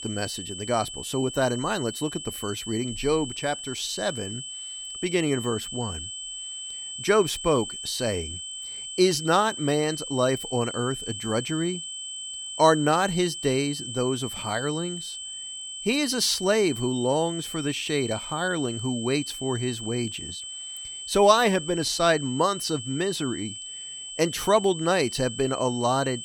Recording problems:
high-pitched whine; loud; throughout; 3 kHz, 8 dB below the speech

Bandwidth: 17 kHz